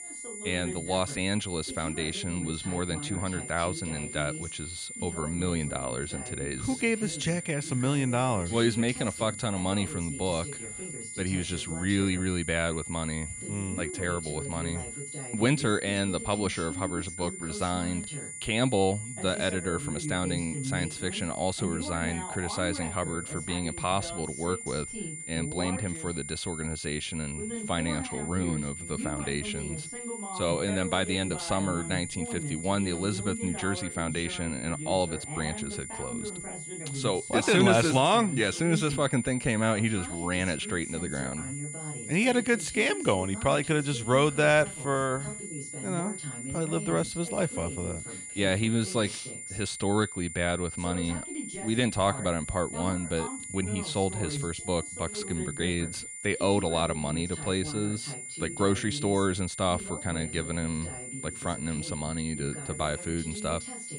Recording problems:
high-pitched whine; loud; throughout; 9.5 kHz, 8 dB below the speech
voice in the background; noticeable; throughout; 10 dB below the speech

